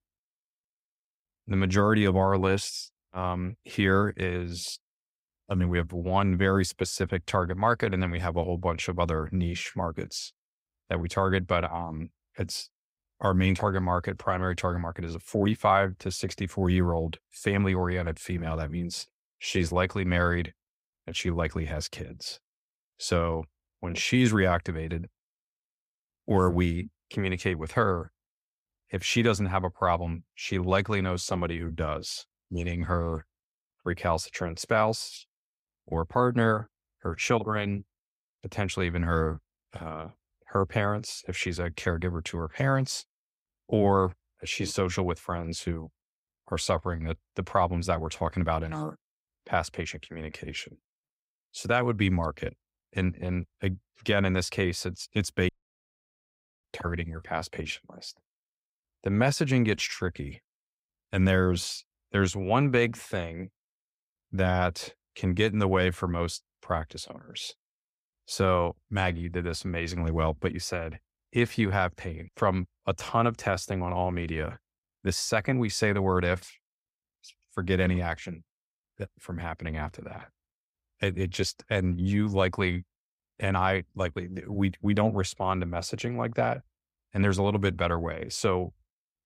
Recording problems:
audio cutting out; at 55 s for 1 s

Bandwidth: 15.5 kHz